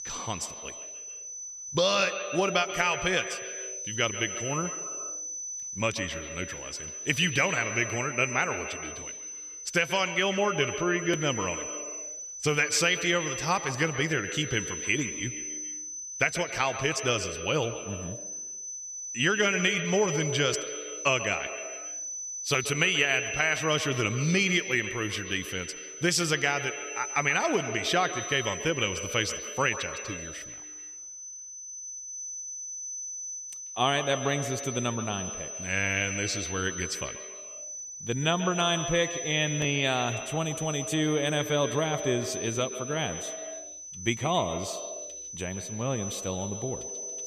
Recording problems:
echo of what is said; strong; throughout; 140 ms later, 10 dB below the speech
high-pitched whine; loud; throughout; 6 kHz, 8 dB below the speech

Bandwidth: 14.5 kHz